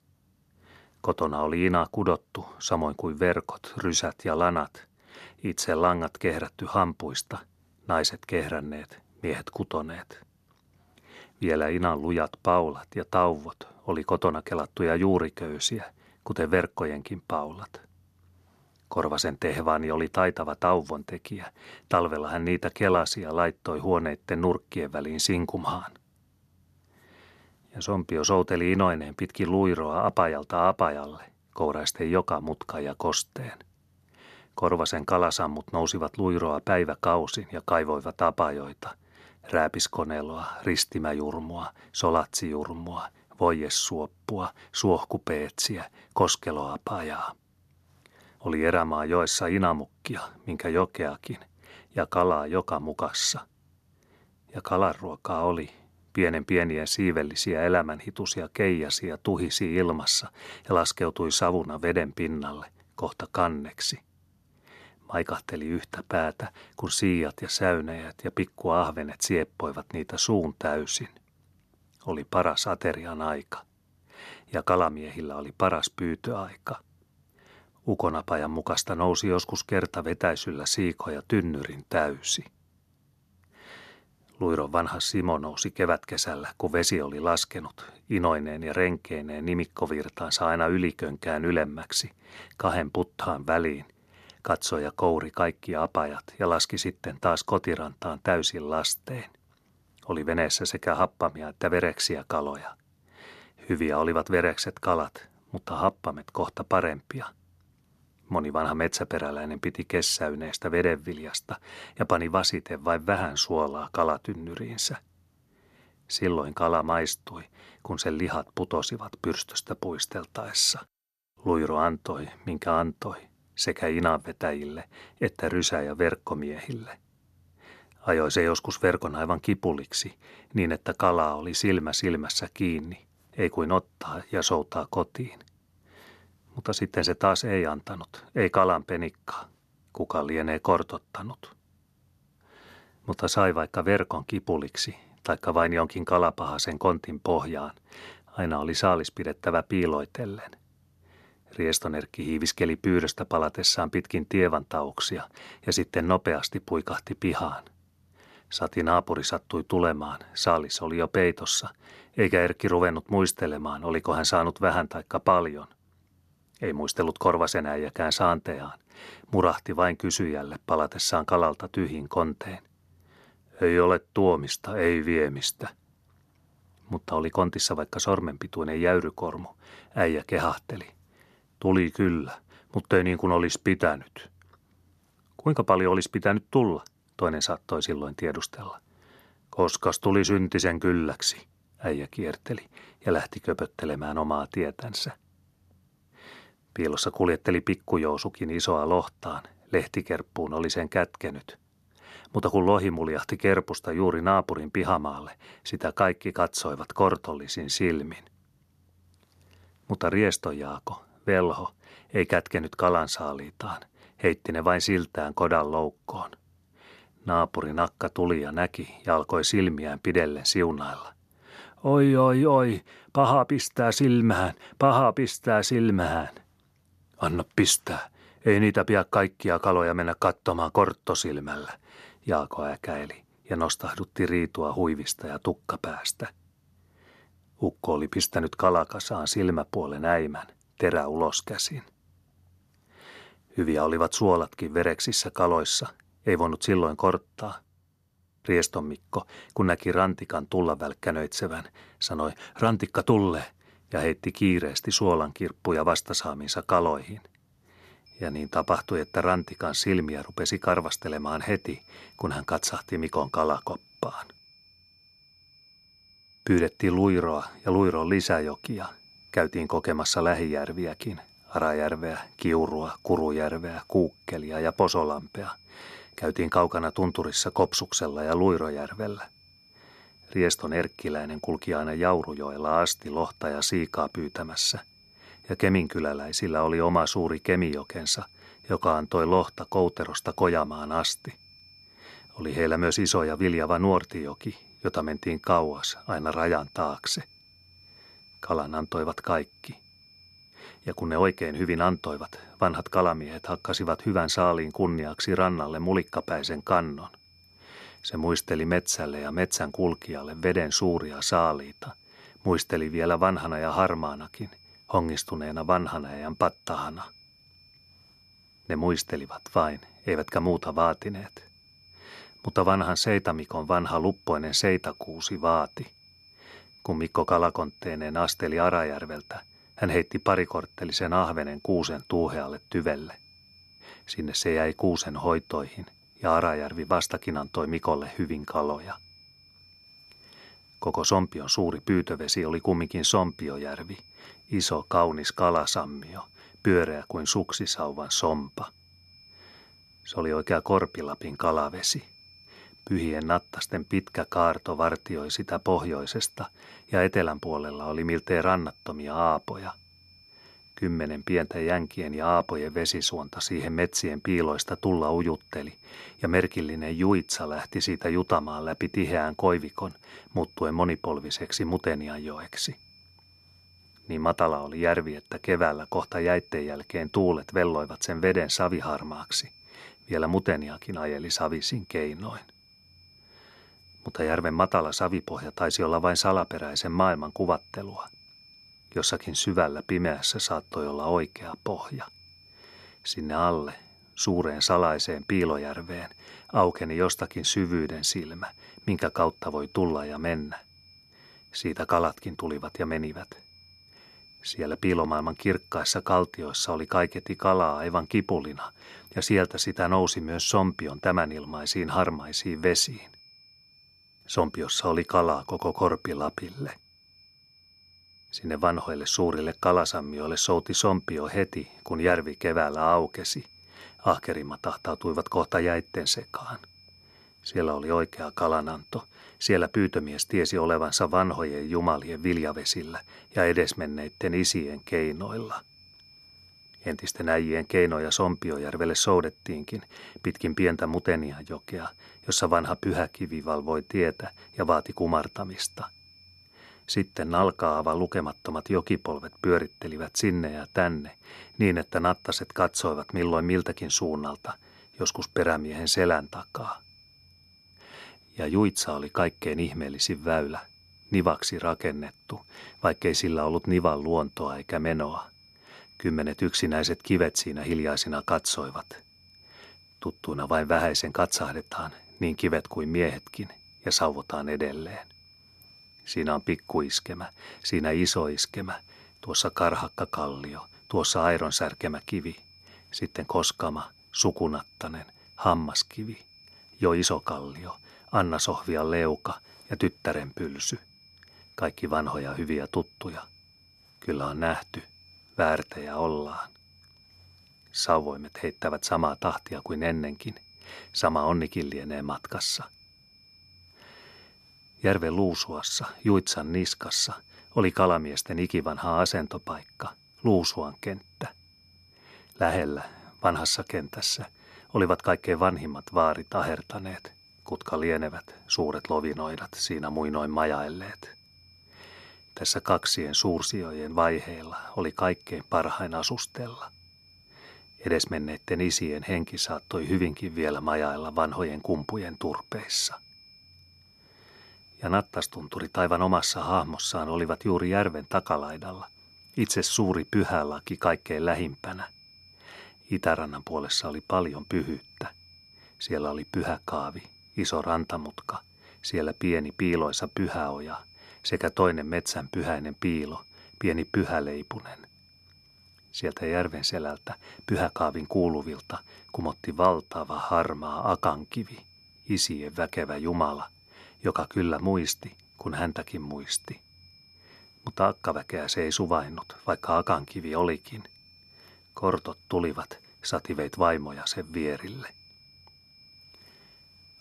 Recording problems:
high-pitched whine; faint; from 4:18 on; 5 kHz, 25 dB below the speech

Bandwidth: 13.5 kHz